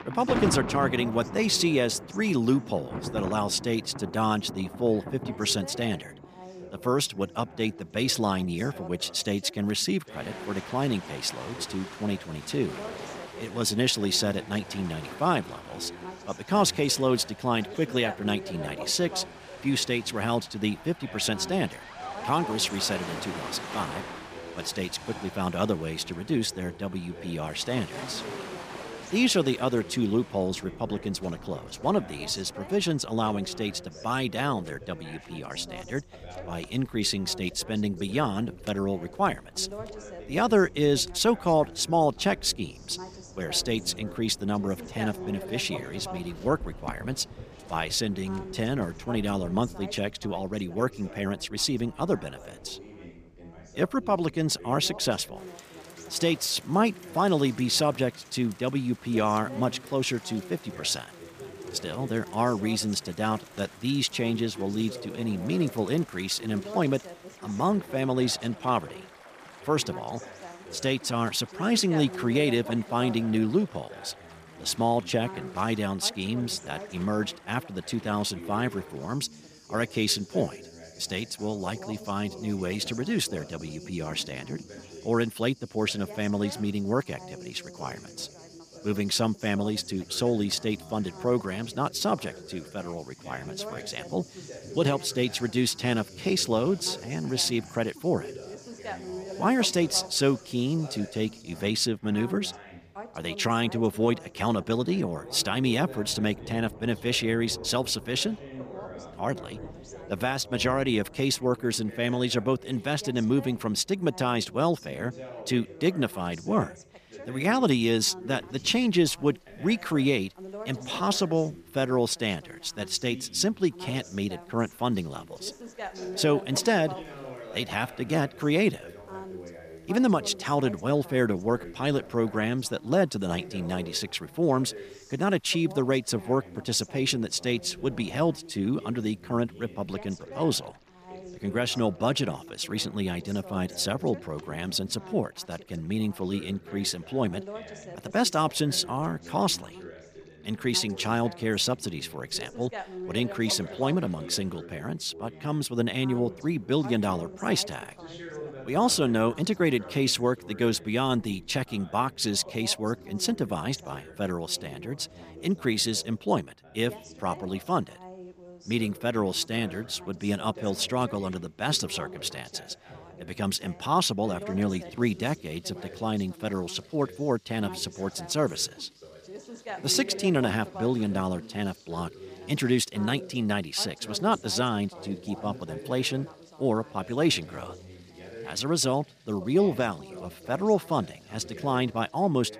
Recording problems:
rain or running water; noticeable; throughout; 15 dB below the speech
background chatter; noticeable; throughout; 2 voices, 15 dB below the speech

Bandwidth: 15 kHz